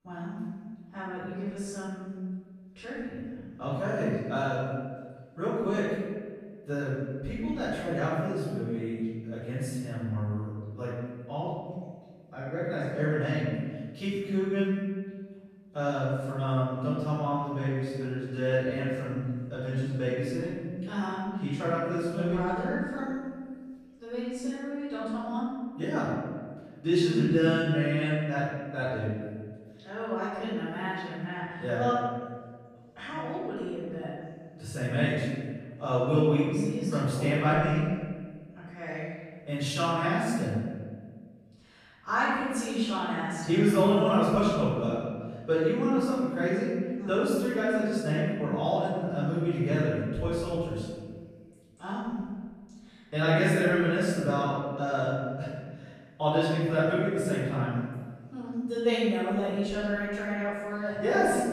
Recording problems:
room echo; strong; dies away in 1.5 s
off-mic speech; far

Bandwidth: 14.5 kHz